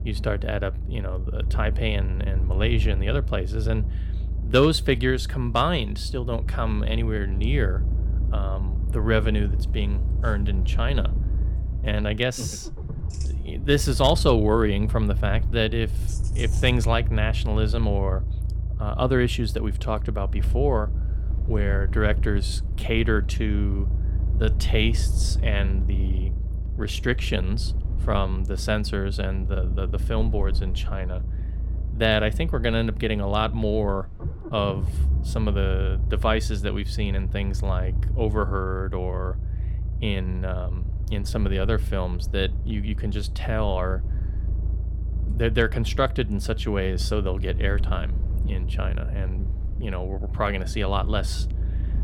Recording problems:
low rumble; noticeable; throughout; 15 dB below the speech

